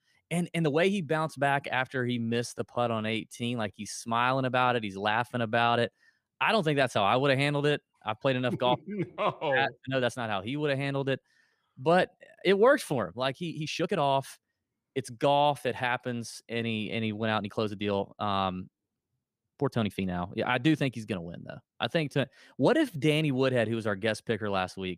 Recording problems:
uneven, jittery; strongly; from 0.5 to 23 s

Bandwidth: 15 kHz